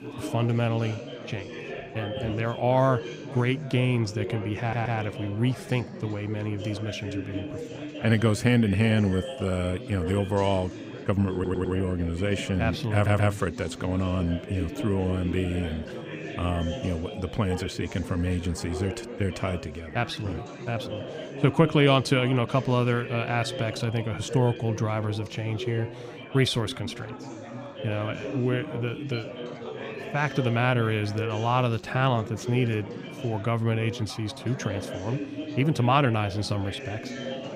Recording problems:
chatter from many people; loud; throughout; 10 dB below the speech
audio stuttering; at 4.5 s, at 11 s and at 13 s

